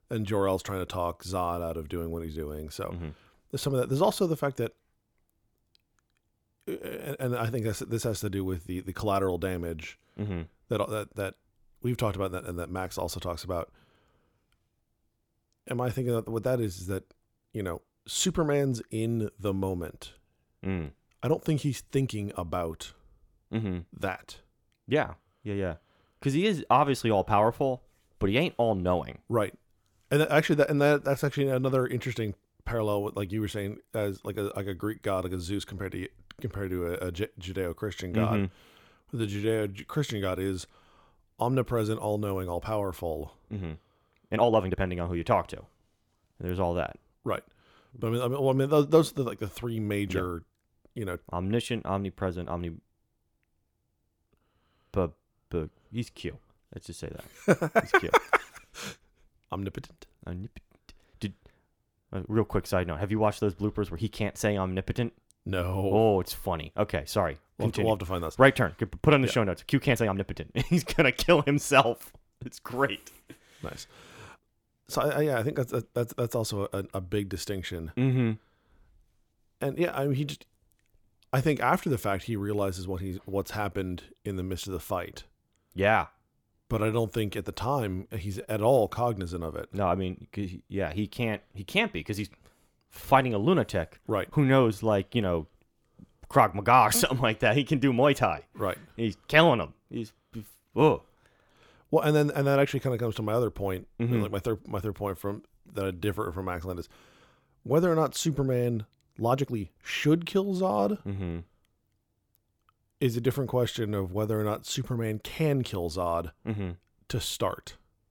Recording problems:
uneven, jittery; strongly; from 24 s to 1:51

